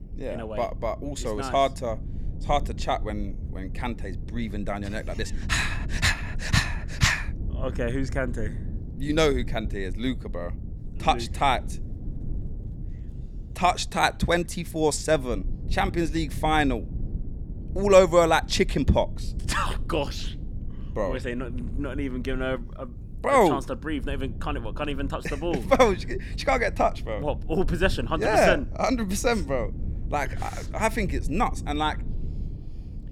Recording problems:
low rumble; faint; throughout; 25 dB below the speech

